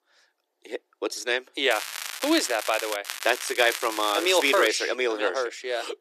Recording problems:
thin; very; fading below 300 Hz
crackling; loud; from 1.5 to 3 s and from 3 to 4.5 s; 8 dB below the speech

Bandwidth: 14 kHz